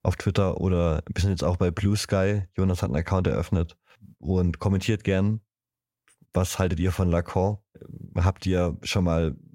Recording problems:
none

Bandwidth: 16 kHz